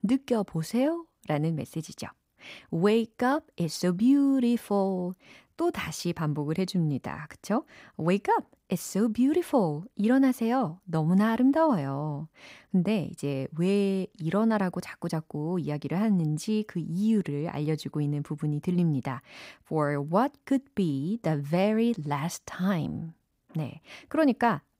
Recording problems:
none

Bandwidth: 15.5 kHz